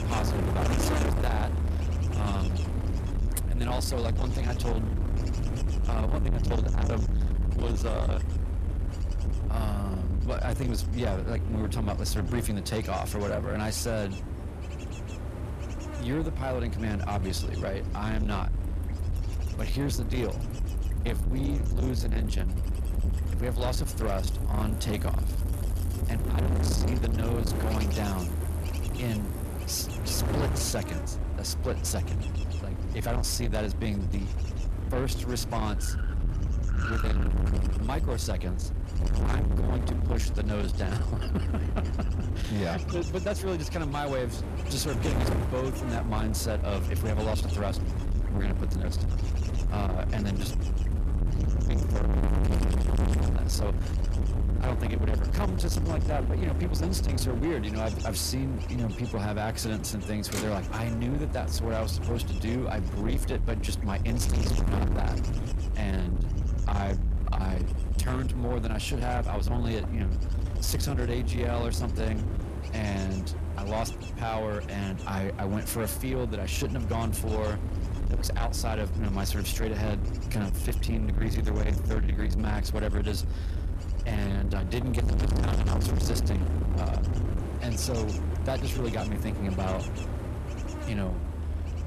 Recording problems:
distortion; heavy; 6 dB below the speech
wind noise on the microphone; heavy; 6 dB below the speech
traffic noise; noticeable; throughout; 15 dB below the speech

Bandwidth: 14 kHz